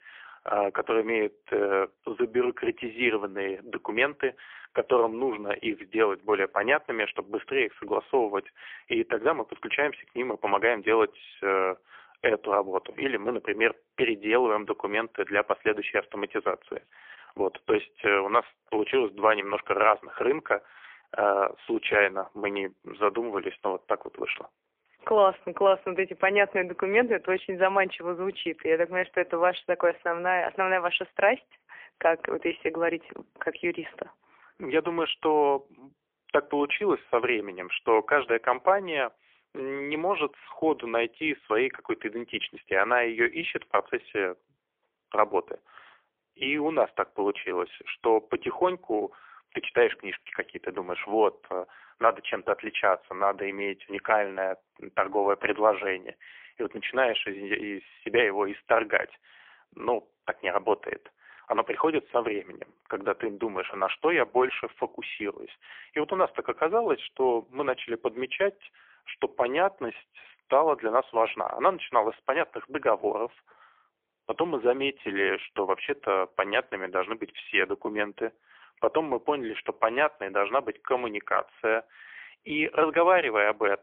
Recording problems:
phone-call audio; poor line; nothing above 3.5 kHz

